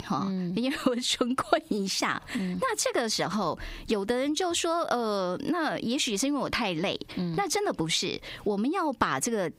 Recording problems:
squashed, flat; somewhat

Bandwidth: 15.5 kHz